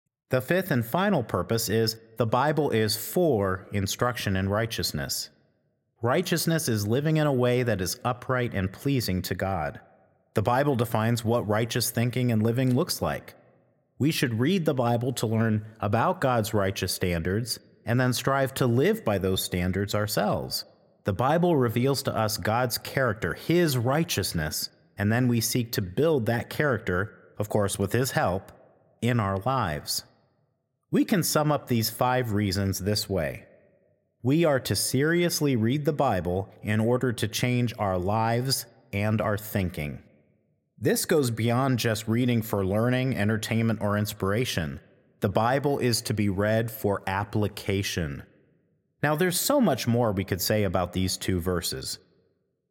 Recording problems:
echo of what is said; faint; throughout; 80 ms later, 25 dB below the speech

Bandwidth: 16.5 kHz